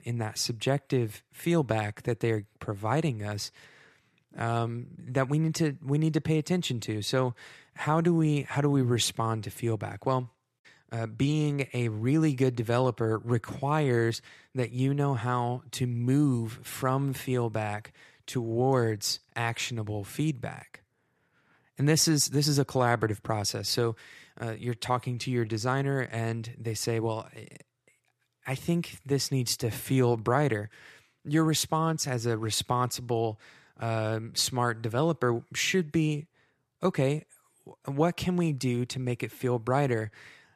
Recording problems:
none

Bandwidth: 14 kHz